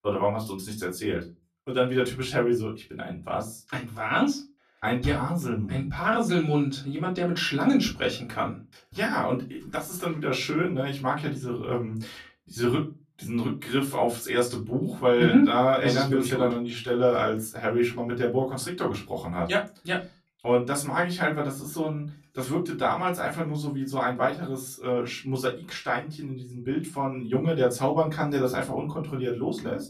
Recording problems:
off-mic speech; far
room echo; very slight; dies away in 0.2 s

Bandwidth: 14.5 kHz